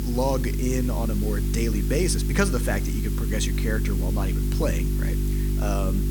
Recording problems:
electrical hum; loud; throughout; 50 Hz, 8 dB below the speech
hiss; noticeable; throughout; 10 dB below the speech

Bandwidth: 18.5 kHz